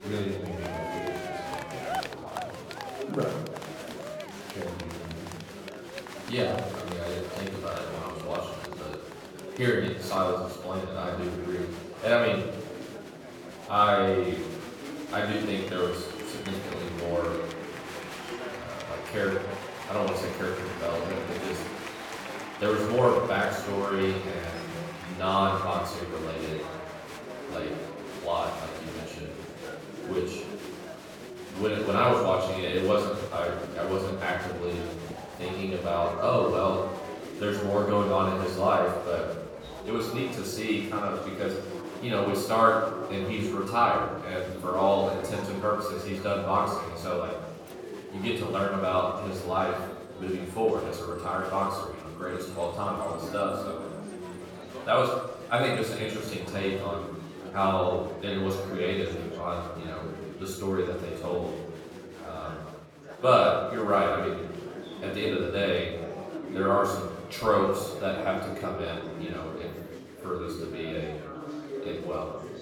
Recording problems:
off-mic speech; far
room echo; noticeable; dies away in 0.8 s
chatter from many people; noticeable; throughout; 10 dB below the speech

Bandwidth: 18 kHz